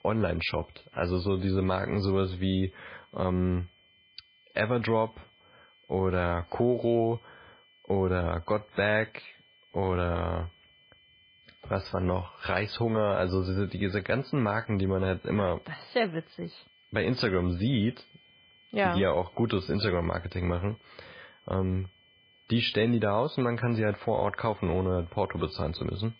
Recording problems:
garbled, watery; badly; nothing above 5 kHz
high-pitched whine; faint; throughout; 3 kHz, 30 dB below the speech

